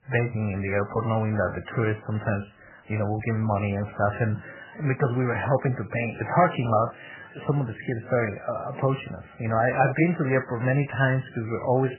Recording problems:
garbled, watery; badly; nothing above 3 kHz

